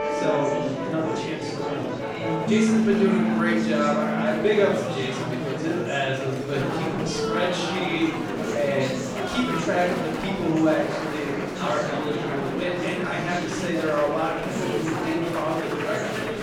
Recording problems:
off-mic speech; far
room echo; noticeable; dies away in 0.7 s
background music; loud; until 5 s; as loud as the speech
murmuring crowd; loud; throughout; 3 dB below the speech

